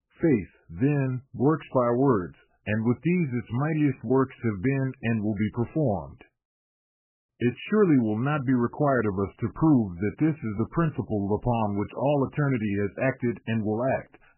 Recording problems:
garbled, watery; badly; nothing above 3 kHz

